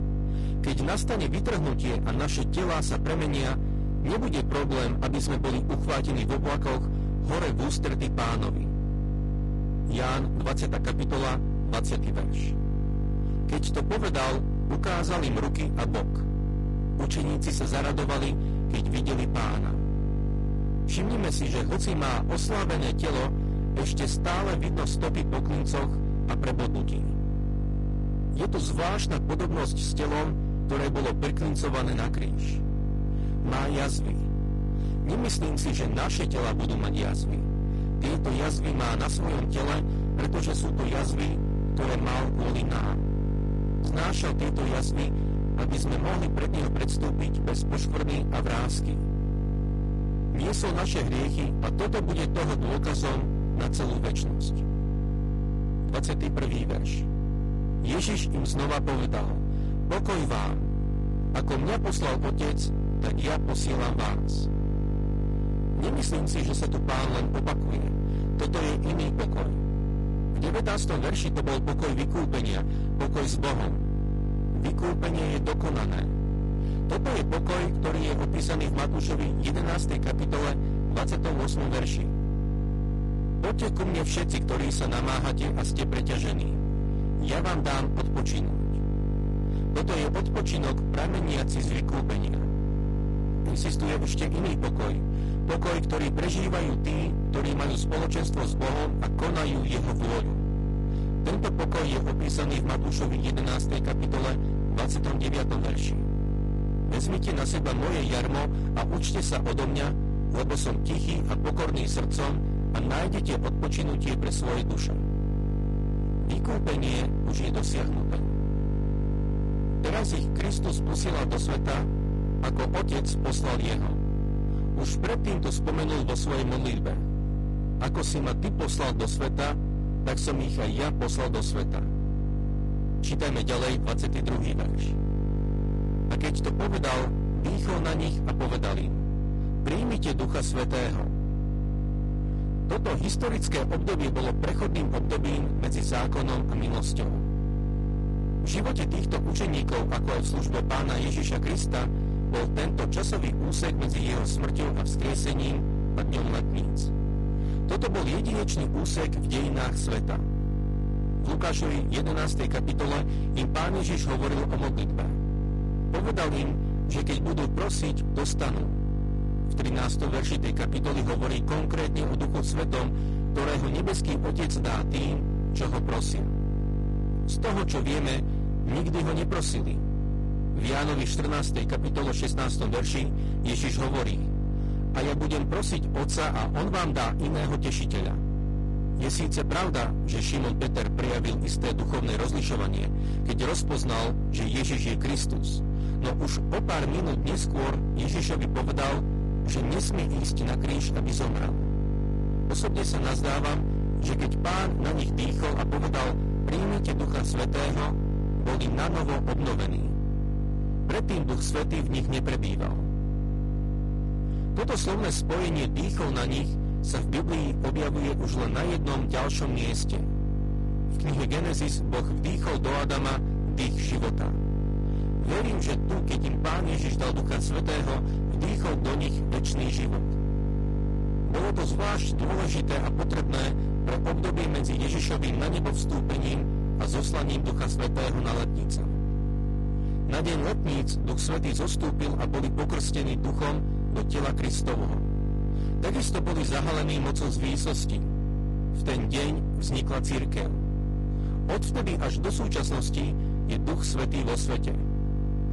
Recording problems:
distortion; heavy; 62% of the sound clipped
garbled, watery; slightly; nothing above 10.5 kHz
electrical hum; loud; throughout; 50 Hz, 5 dB below the speech

